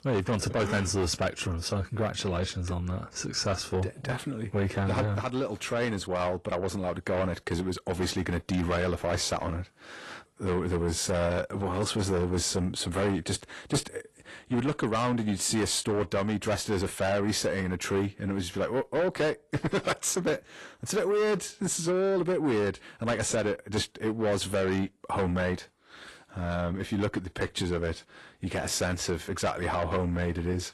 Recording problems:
distortion; heavy; 8 dB below the speech
garbled, watery; slightly; nothing above 11.5 kHz

